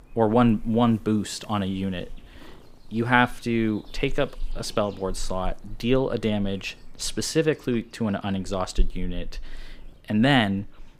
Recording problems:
animal sounds; noticeable; throughout; 20 dB below the speech

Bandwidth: 15.5 kHz